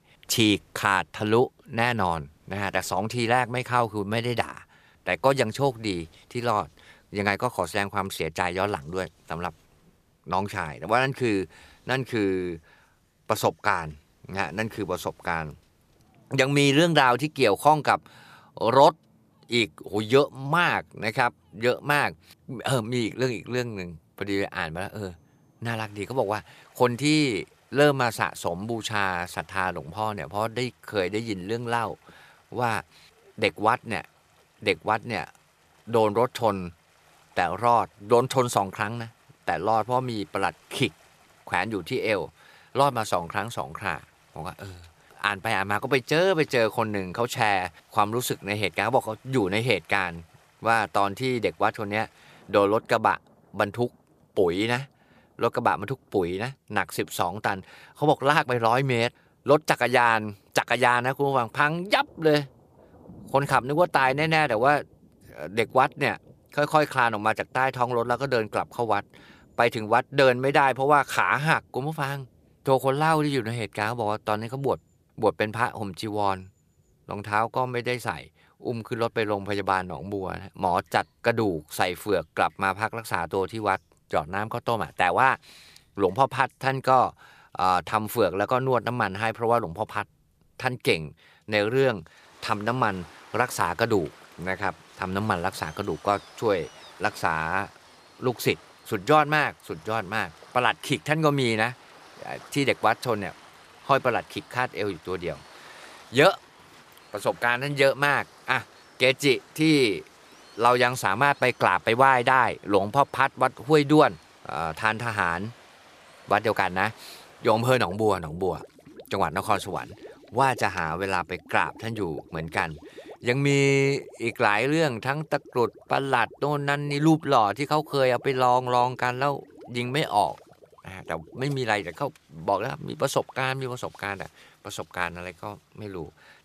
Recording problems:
rain or running water; faint; throughout; 25 dB below the speech

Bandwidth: 14.5 kHz